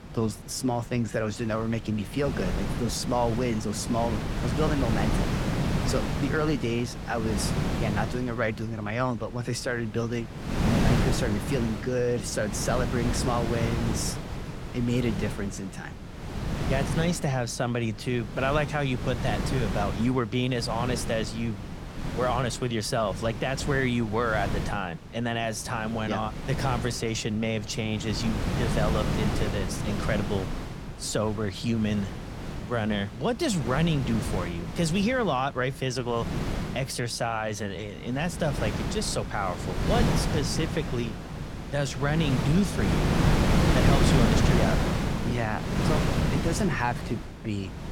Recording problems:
wind noise on the microphone; heavy; 4 dB below the speech

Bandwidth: 17 kHz